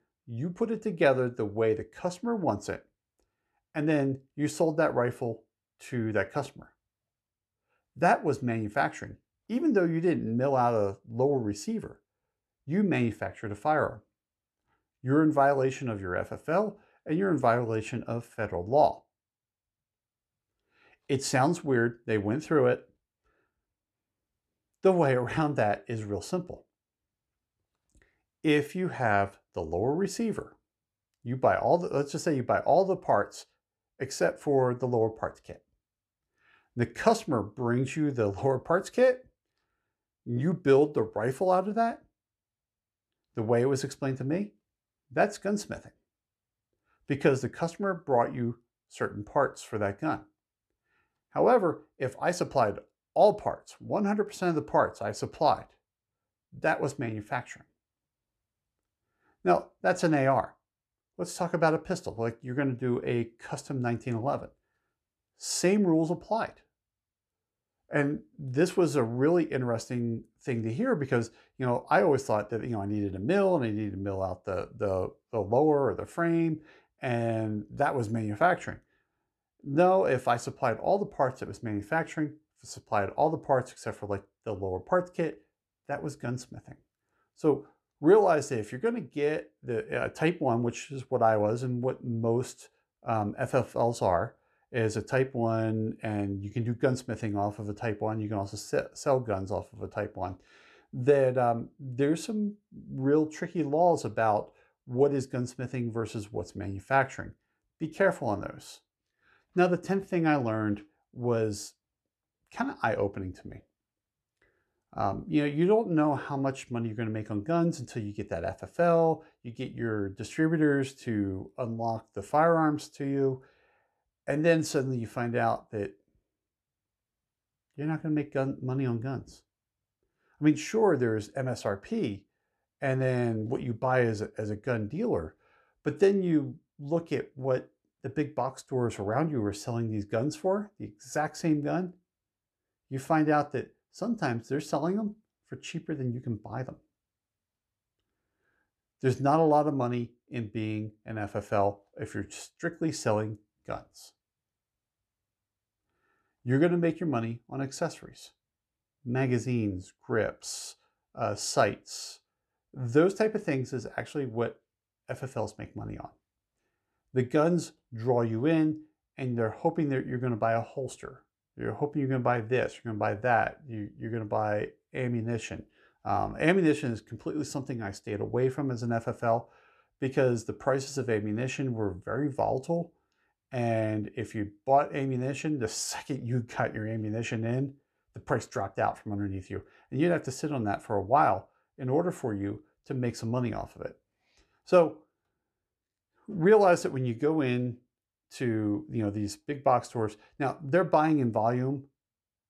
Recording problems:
none

